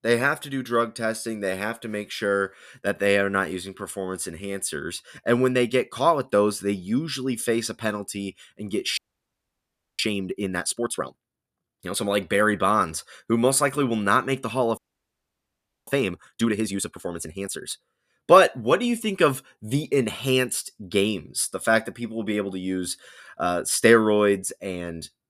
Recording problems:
audio freezing; at 9 s for 1 s and at 15 s for 1 s

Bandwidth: 14.5 kHz